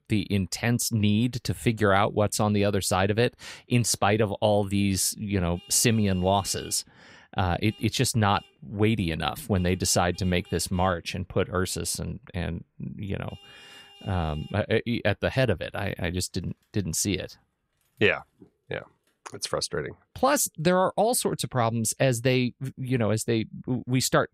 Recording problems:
traffic noise; faint; from 5.5 s on; 25 dB below the speech

